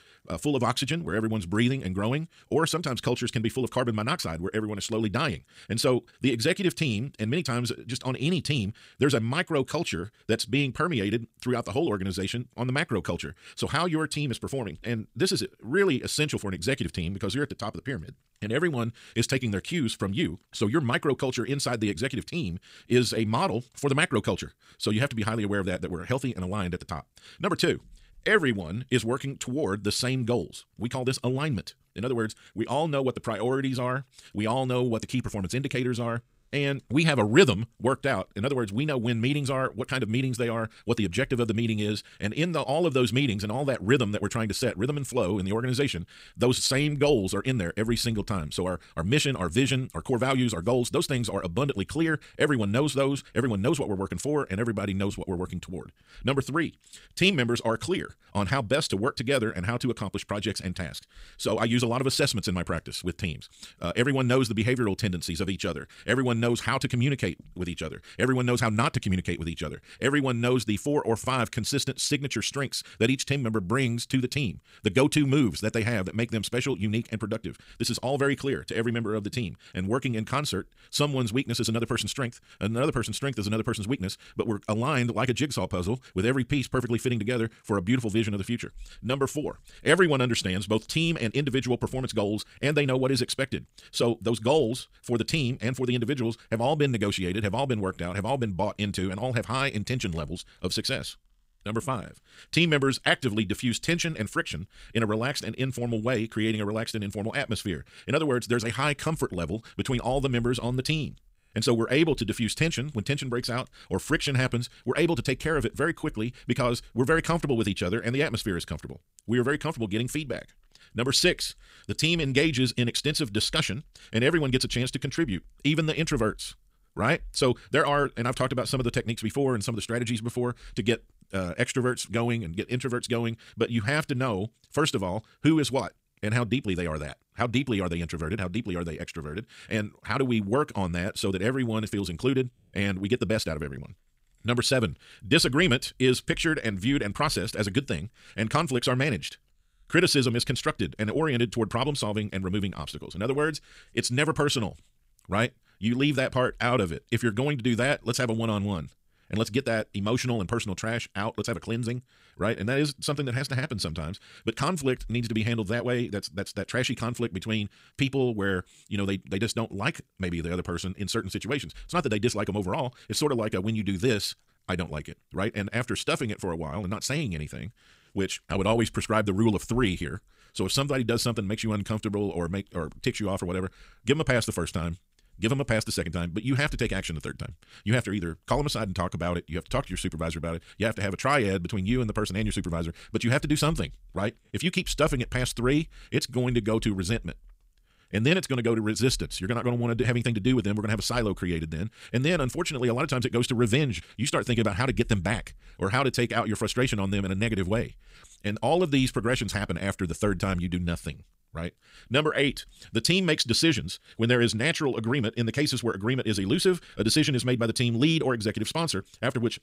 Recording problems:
wrong speed, natural pitch; too fast; 1.6 times normal speed

